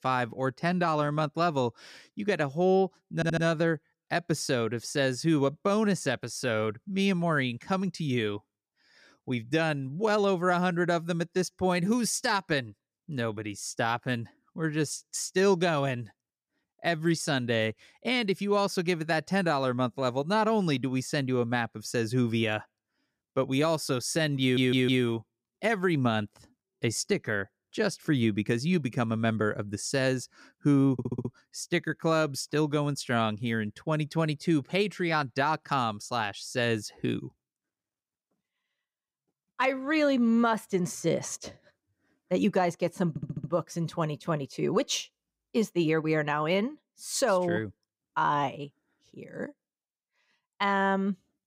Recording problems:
audio stuttering; 4 times, first at 3 s

